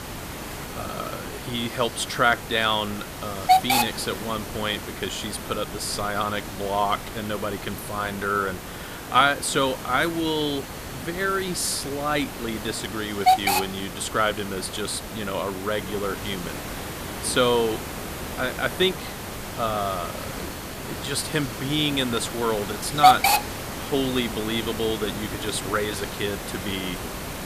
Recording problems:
hiss; loud; throughout; 3 dB below the speech

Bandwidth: 14.5 kHz